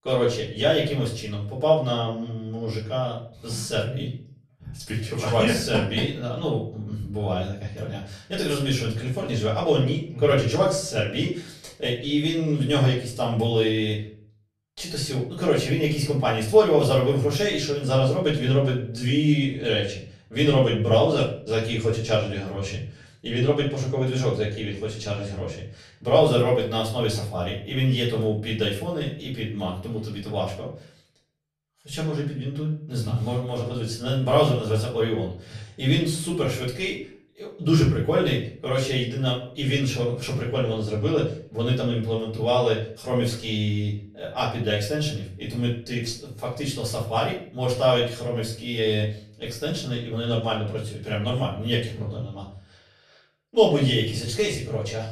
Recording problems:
off-mic speech; far
room echo; slight; dies away in 0.4 s

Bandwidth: 13.5 kHz